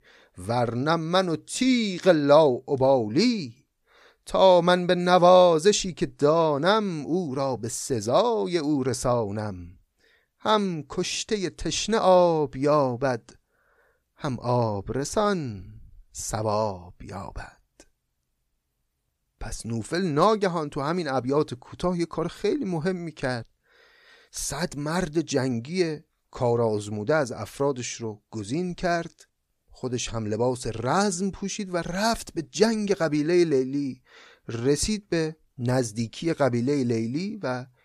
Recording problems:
none

